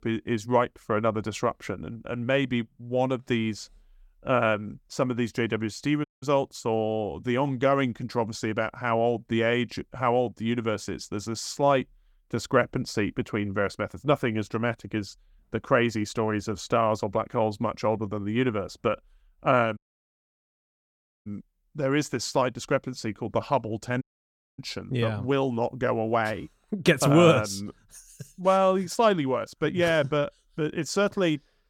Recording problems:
audio cutting out; at 6 s, at 20 s for 1.5 s and at 24 s for 0.5 s

